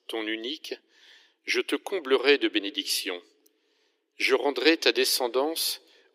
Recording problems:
thin; somewhat; fading below 300 Hz

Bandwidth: 15.5 kHz